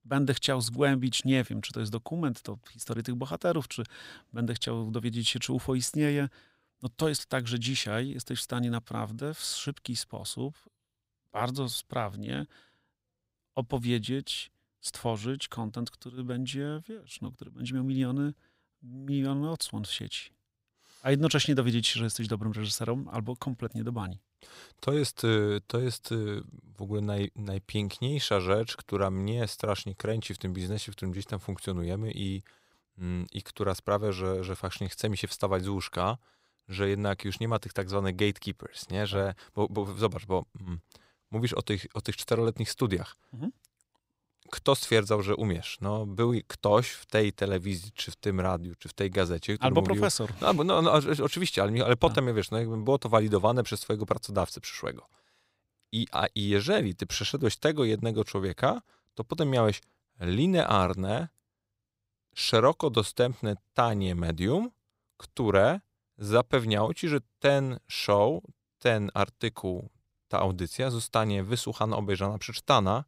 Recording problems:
none

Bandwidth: 15.5 kHz